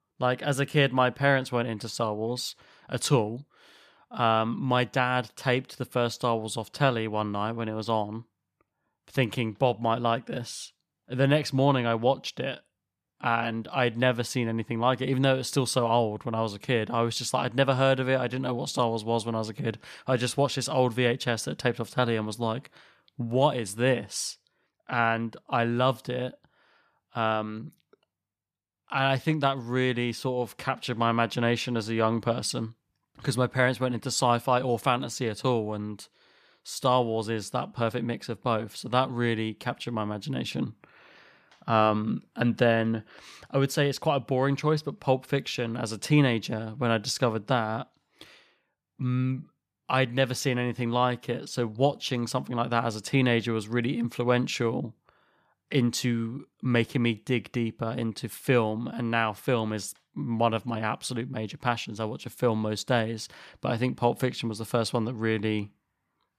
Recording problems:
none

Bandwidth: 14.5 kHz